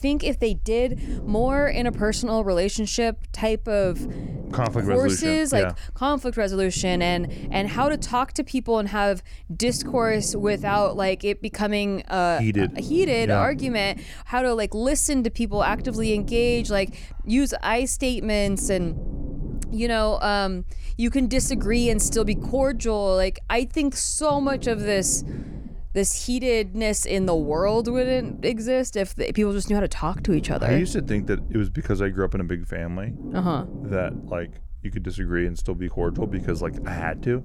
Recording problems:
low rumble; noticeable; throughout; 15 dB below the speech

